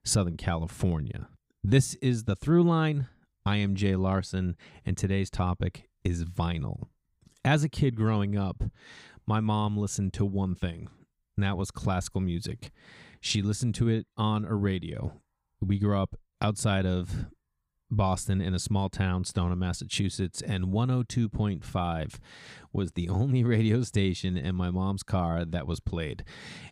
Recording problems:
none

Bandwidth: 15.5 kHz